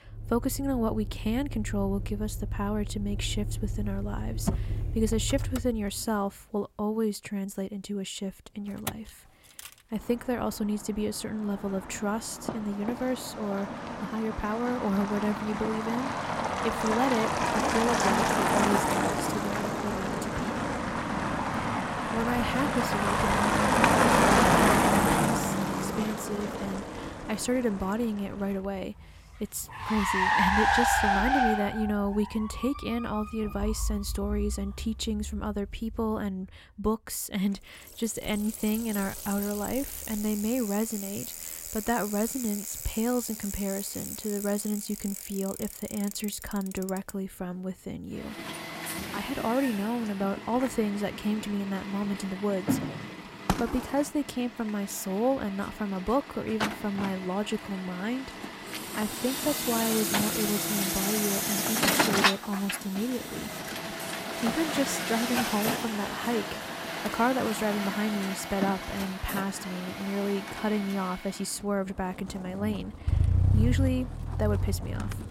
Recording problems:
traffic noise; very loud; throughout; 1 dB above the speech

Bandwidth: 16 kHz